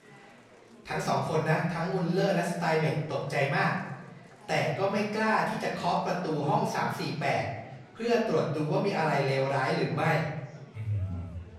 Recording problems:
off-mic speech; far
room echo; noticeable; dies away in 0.9 s
murmuring crowd; faint; throughout; 25 dB below the speech

